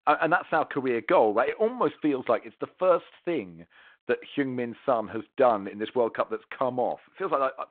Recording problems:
phone-call audio; nothing above 4 kHz

